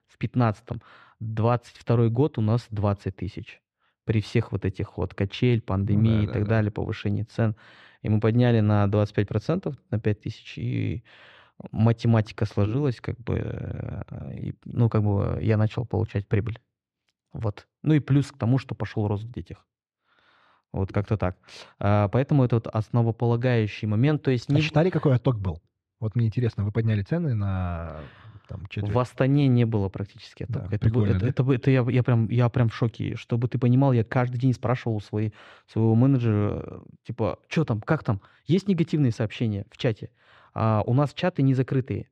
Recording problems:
muffled; slightly; fading above 3 kHz

